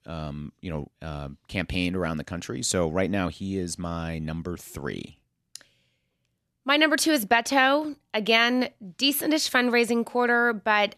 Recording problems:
none

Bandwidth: 13.5 kHz